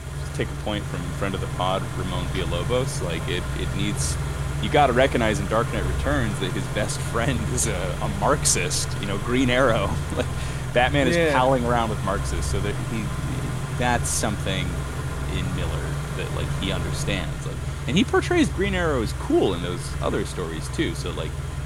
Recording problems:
traffic noise; loud; throughout; 4 dB below the speech

